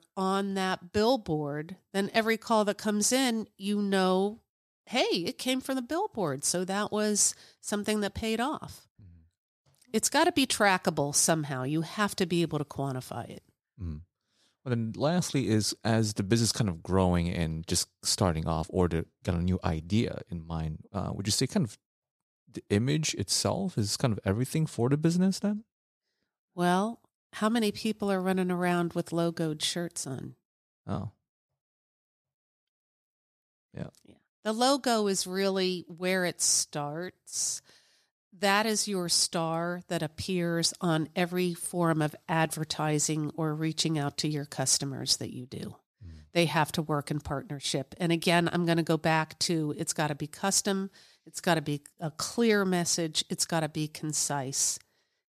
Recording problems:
none

